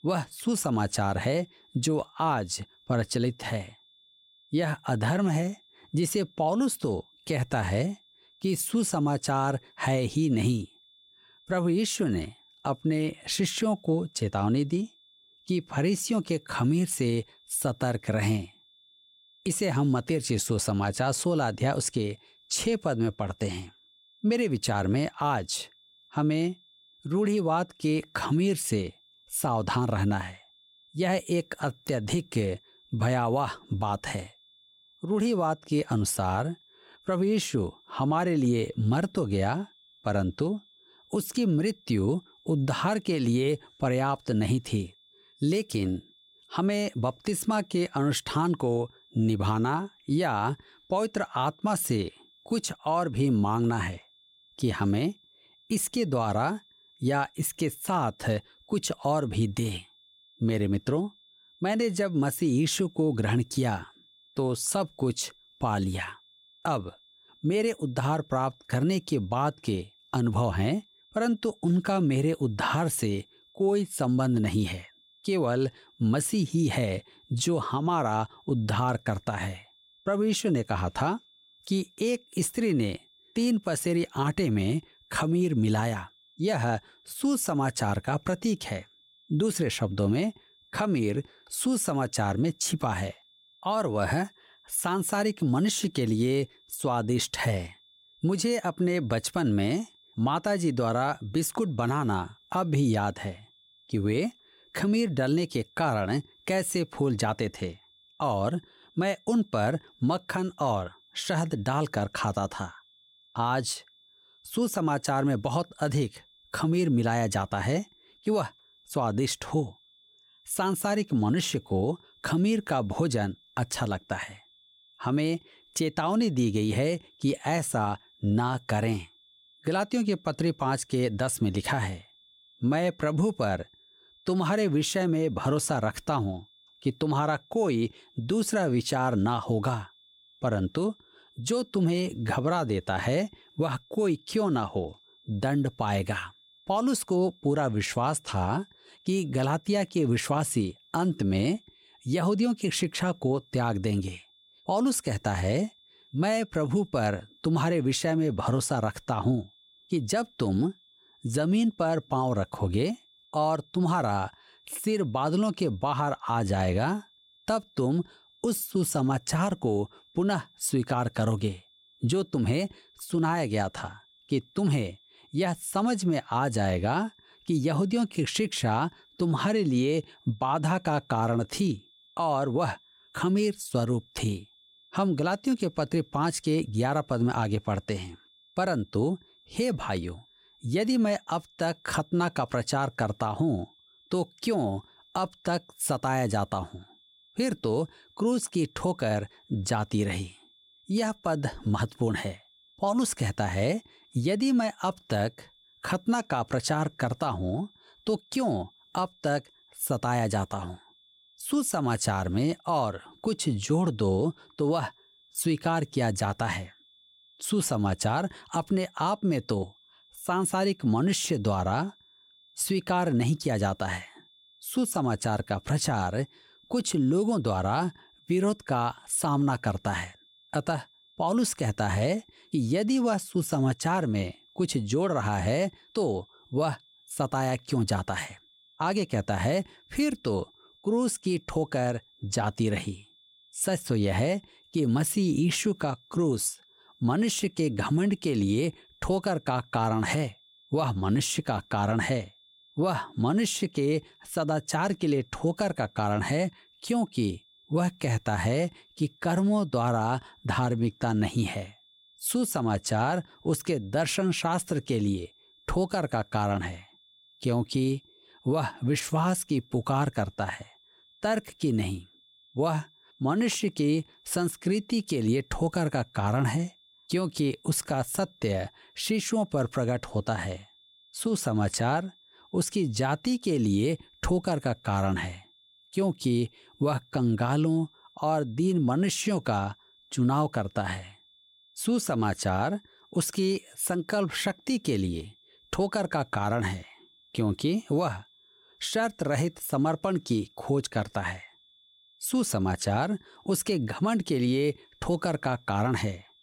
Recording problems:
high-pitched whine; faint; throughout; 3.5 kHz, 30 dB below the speech

